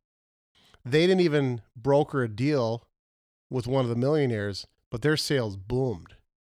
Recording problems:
none

